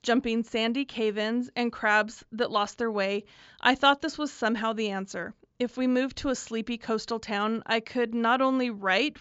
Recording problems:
high frequencies cut off; noticeable; nothing above 7.5 kHz

